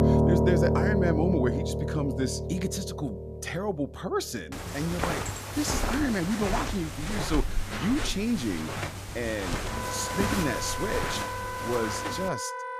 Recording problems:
background music; very loud; throughout; 1 dB above the speech
footsteps; loud; from 4.5 to 12 s; peak 2 dB above the speech

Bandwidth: 14.5 kHz